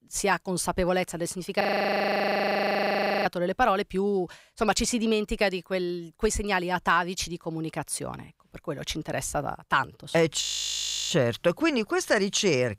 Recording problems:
audio freezing; at 1.5 s for 1.5 s and at 10 s for 0.5 s

